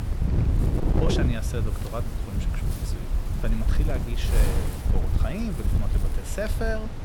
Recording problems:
wind noise on the microphone; heavy; 2 dB below the speech

